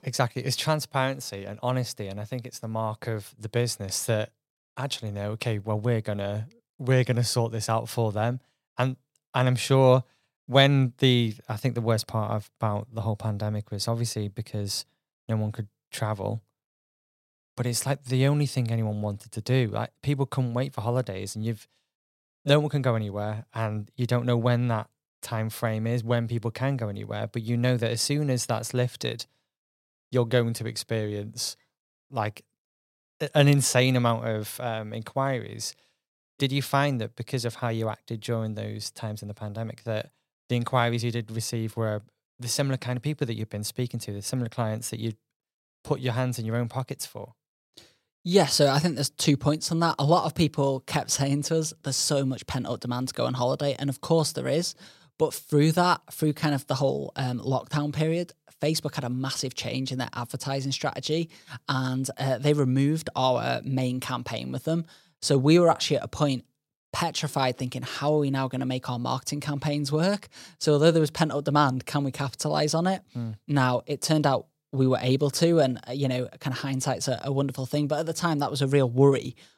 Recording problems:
none

